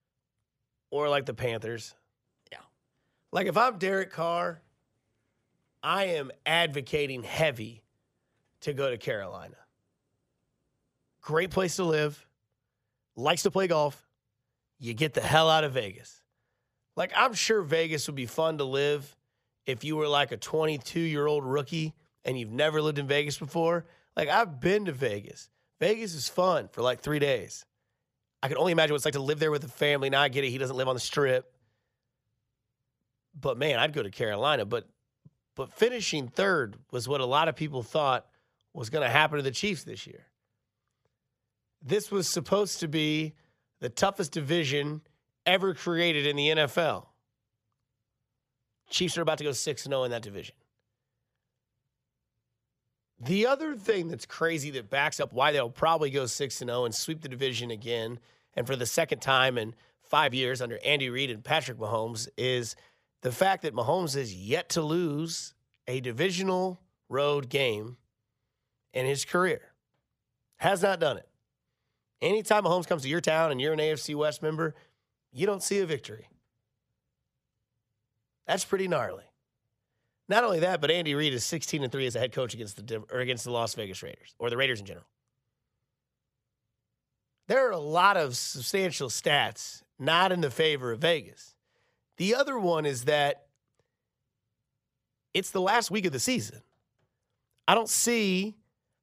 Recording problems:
uneven, jittery; strongly; from 11 s to 1:36

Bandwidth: 15 kHz